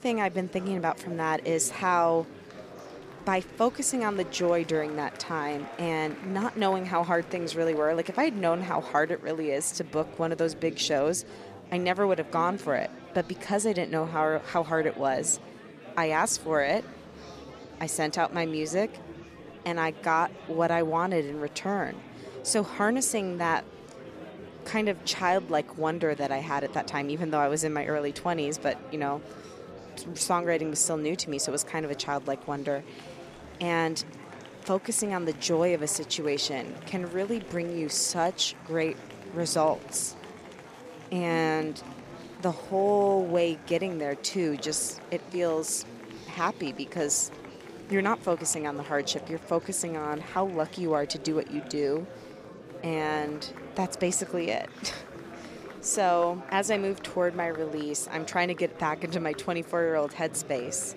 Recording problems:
murmuring crowd; noticeable; throughout; 15 dB below the speech

